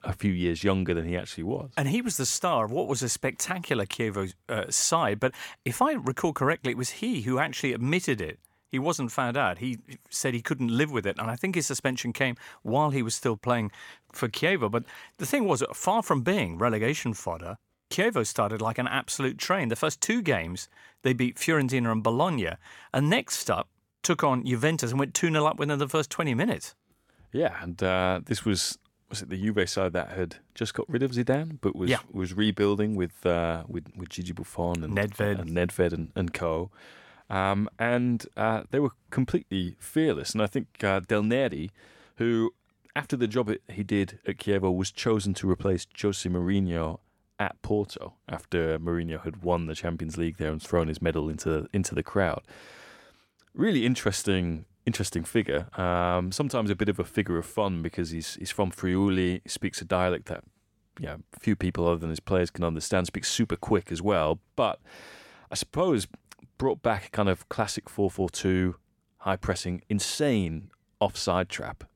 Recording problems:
none

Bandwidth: 17 kHz